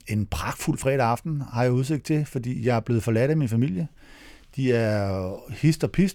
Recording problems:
none

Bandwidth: 18.5 kHz